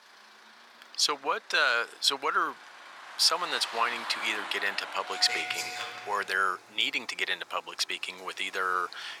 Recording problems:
thin; very; fading below 950 Hz
traffic noise; loud; throughout; 9 dB below the speech

